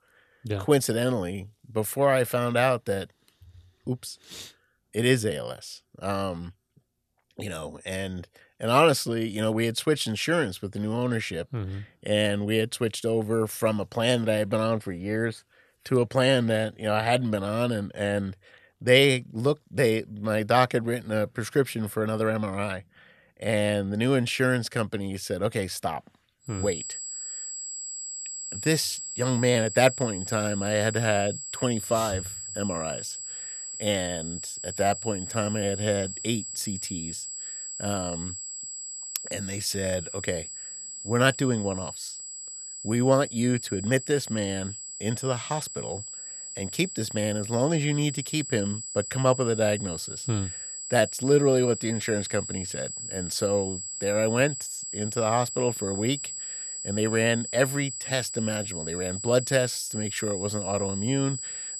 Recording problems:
high-pitched whine; loud; from 27 s on; 7.5 kHz, 7 dB below the speech

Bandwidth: 14 kHz